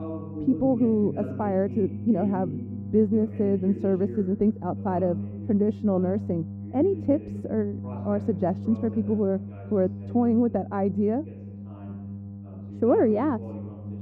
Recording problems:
muffled; very; fading above 1 kHz
electrical hum; noticeable; throughout; 50 Hz, 20 dB below the speech
voice in the background; noticeable; throughout; 15 dB below the speech

